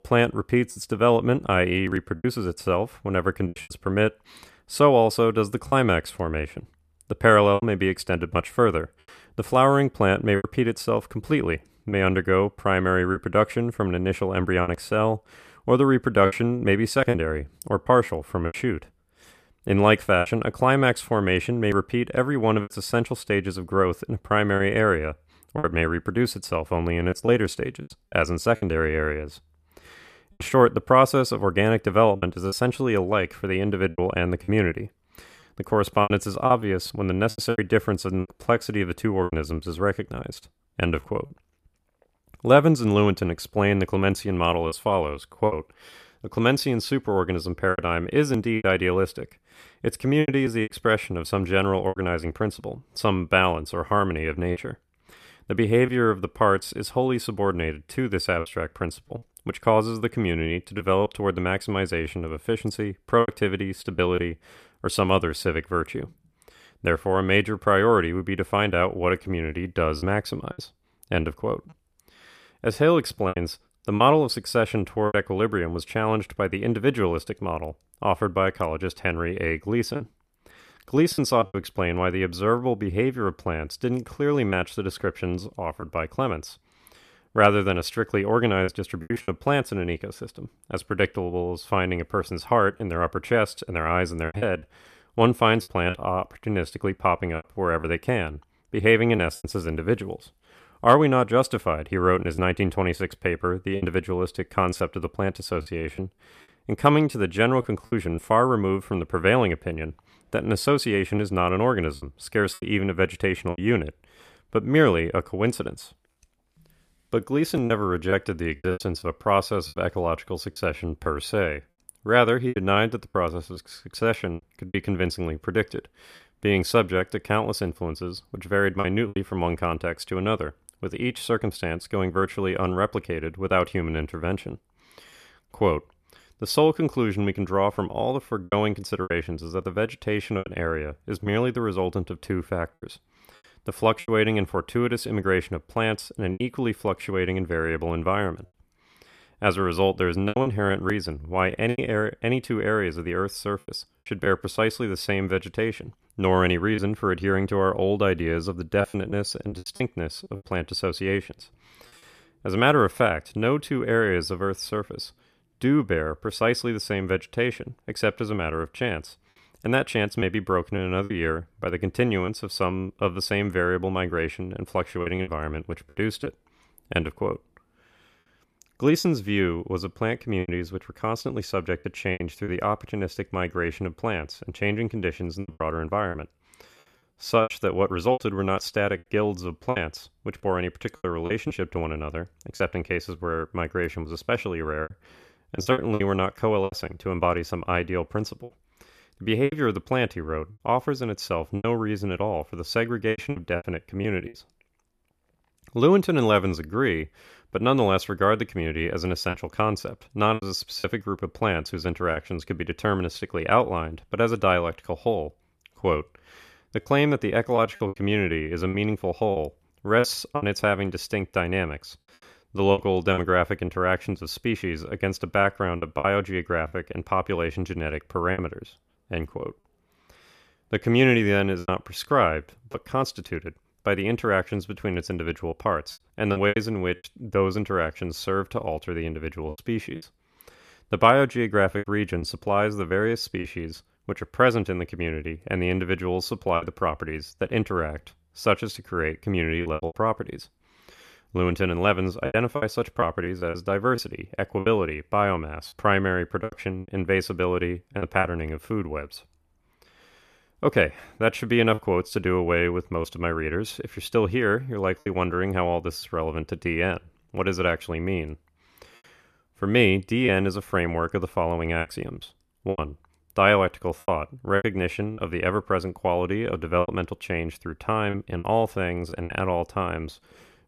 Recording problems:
choppy; very; 5% of the speech affected

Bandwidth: 14.5 kHz